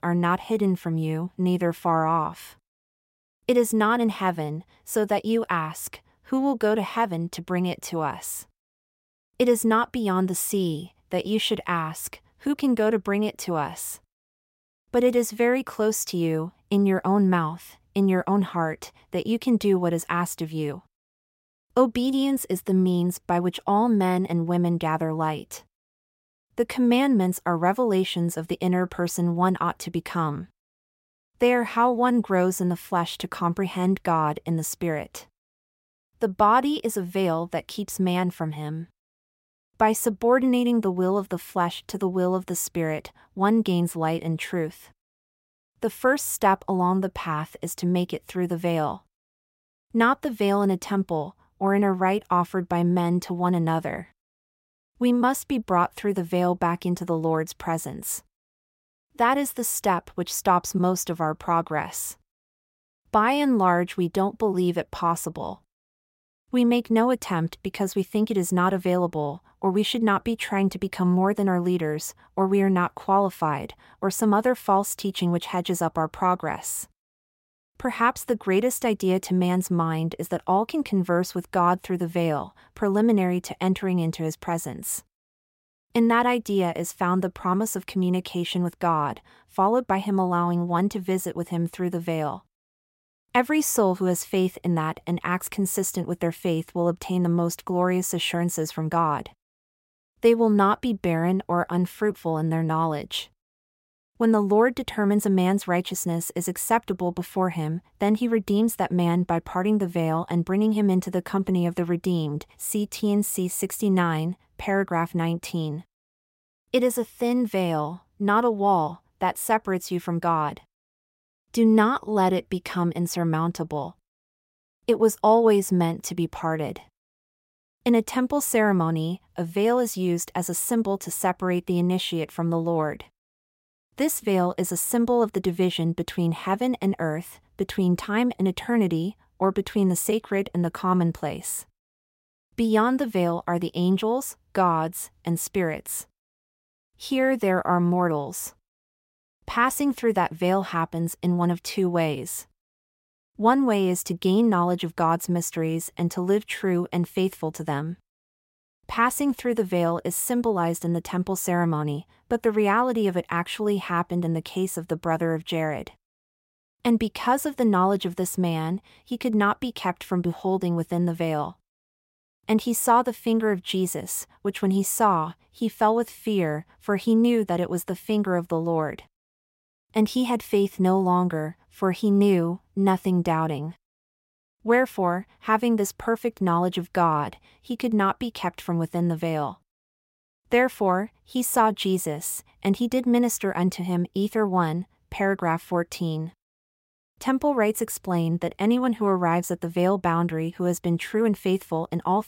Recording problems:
none

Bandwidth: 16 kHz